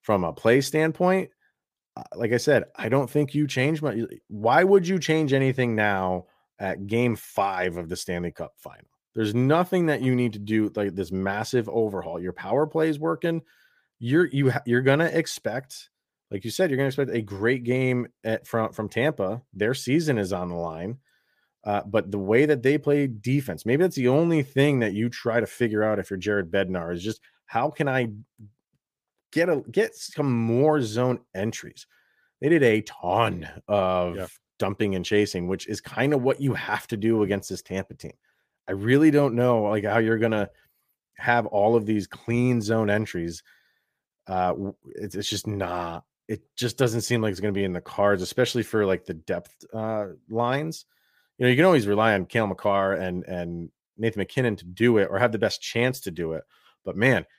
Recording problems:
none

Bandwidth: 15 kHz